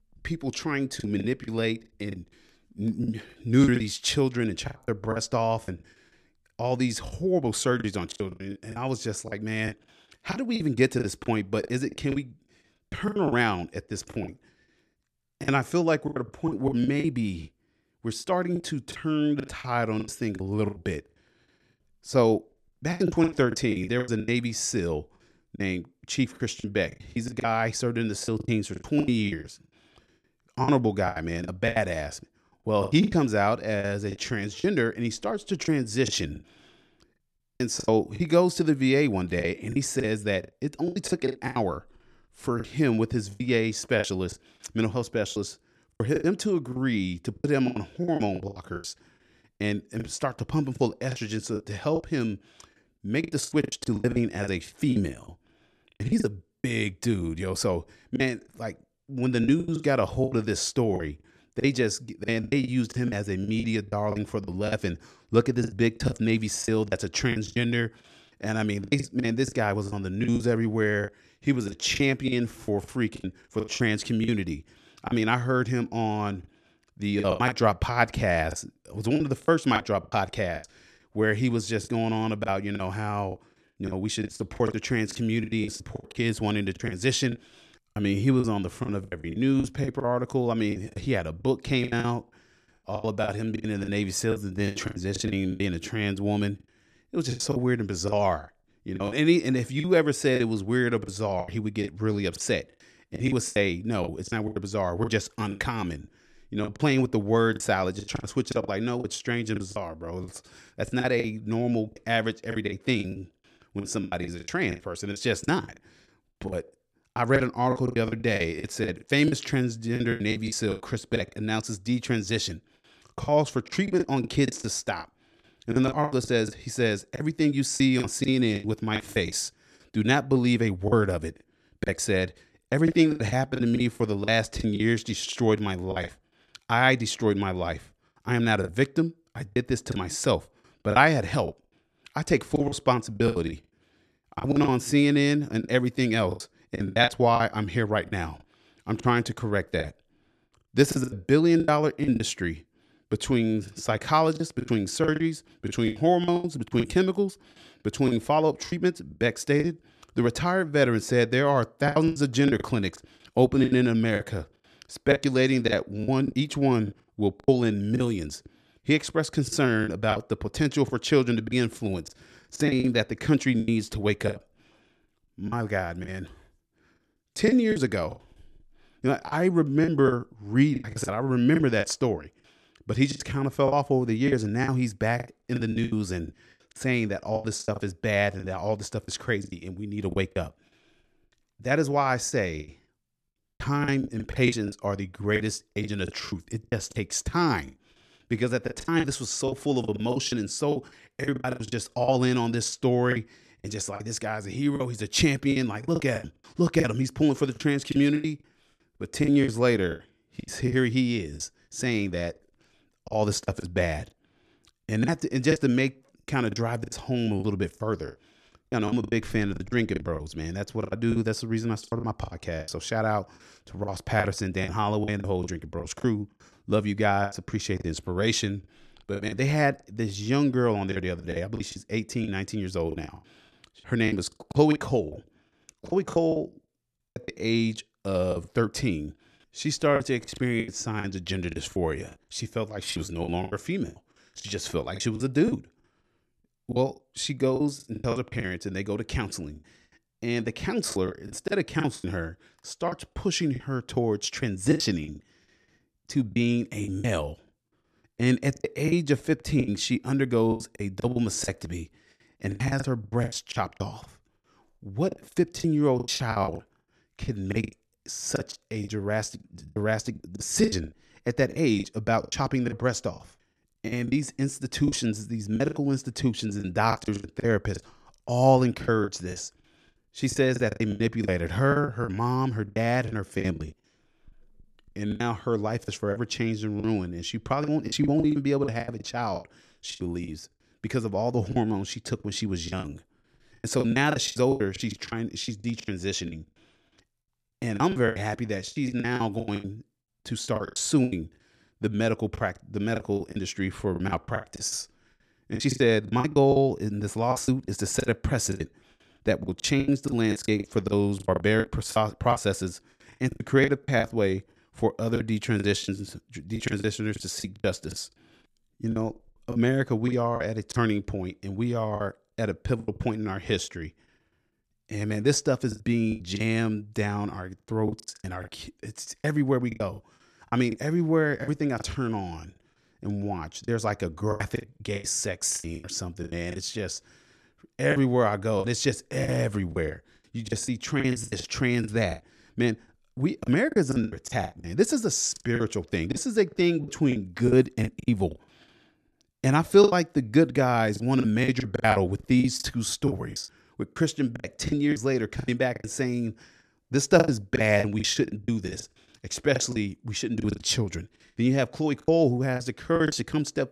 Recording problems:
choppy; very; 14% of the speech affected

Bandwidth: 13.5 kHz